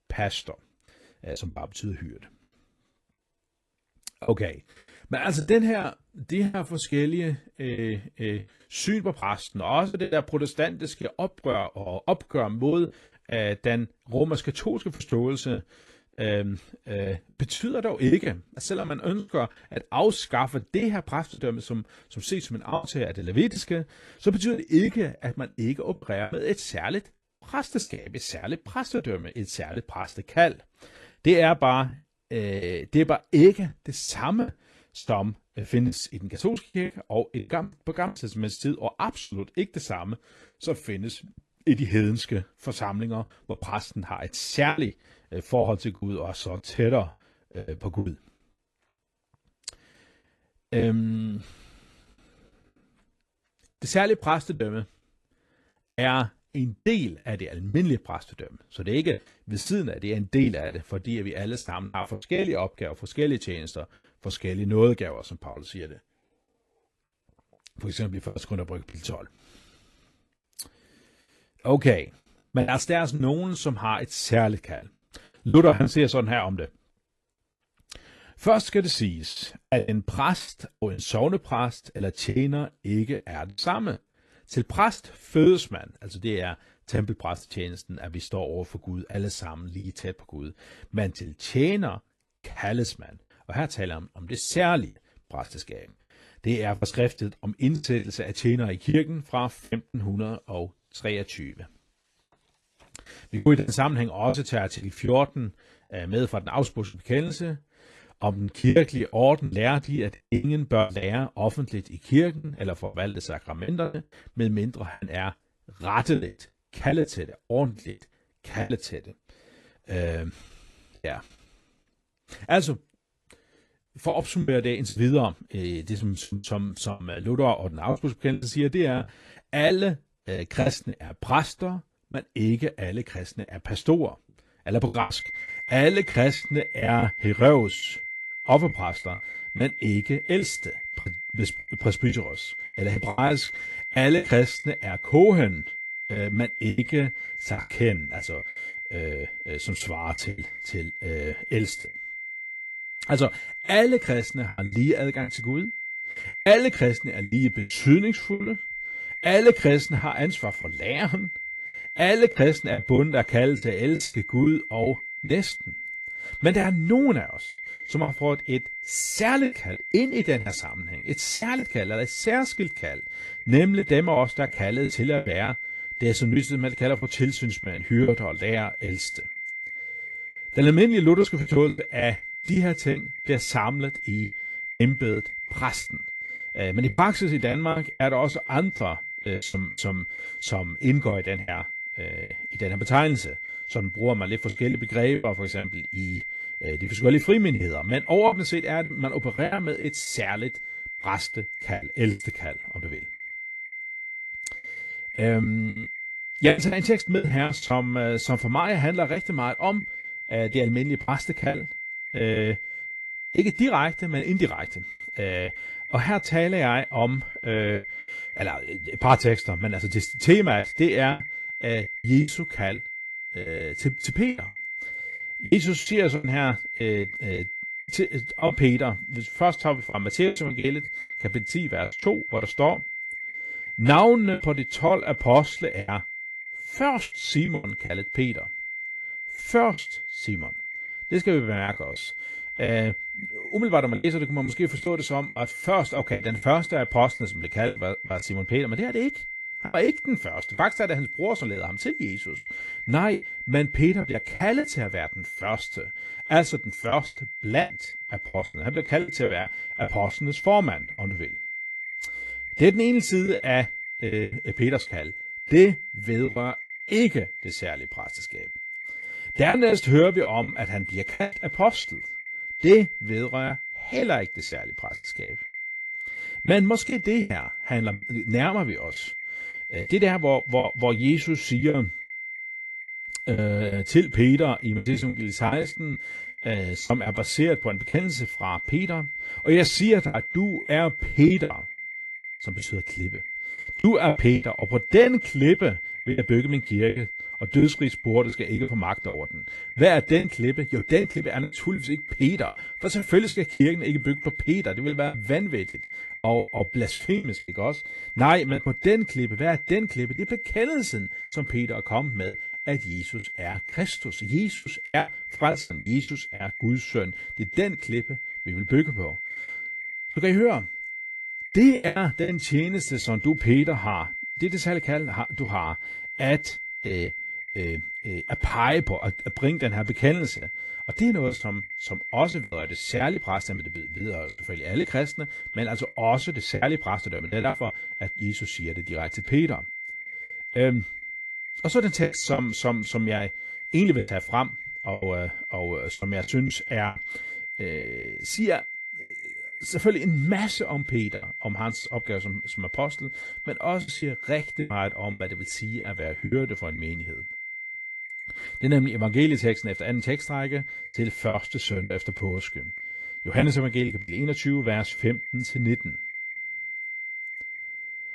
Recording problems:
garbled, watery; slightly; nothing above 11.5 kHz
high-pitched whine; loud; from 2:15 on; 2 kHz, 7 dB below the speech
choppy; very; 8% of the speech affected

